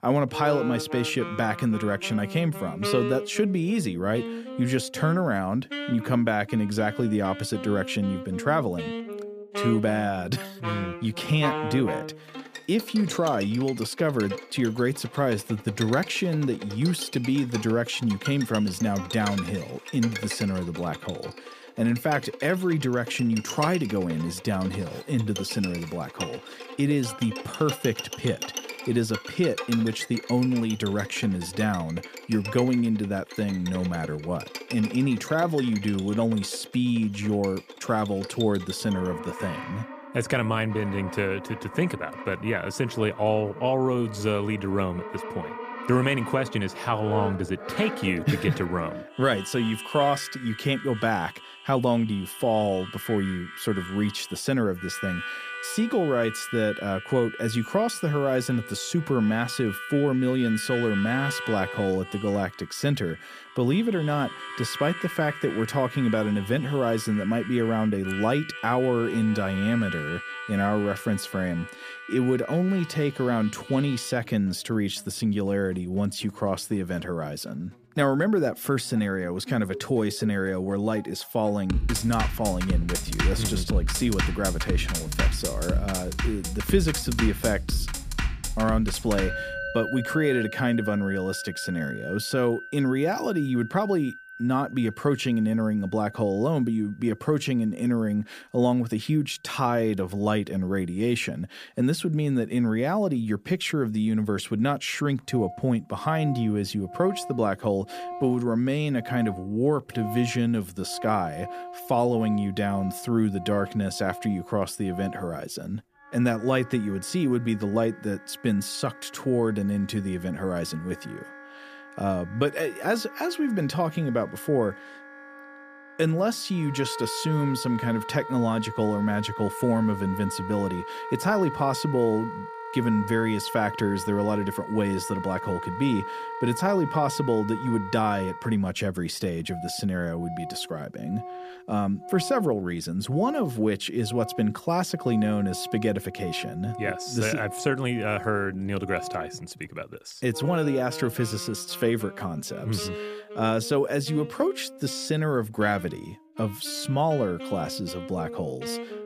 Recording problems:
background music; loud; throughout; 9 dB below the speech

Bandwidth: 15 kHz